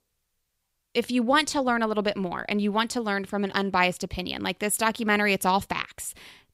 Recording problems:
none

